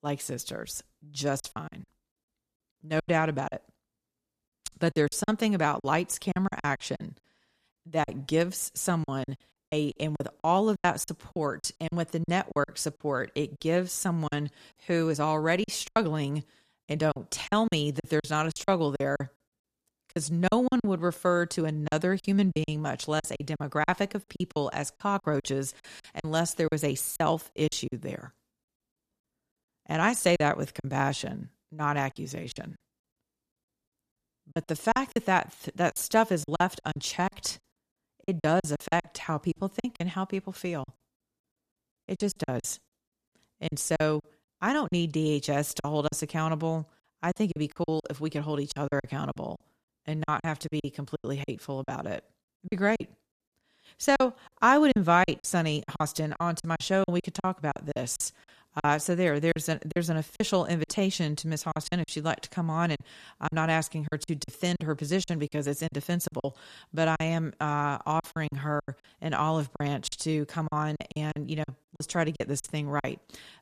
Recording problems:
choppy; very; 12% of the speech affected

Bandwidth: 14.5 kHz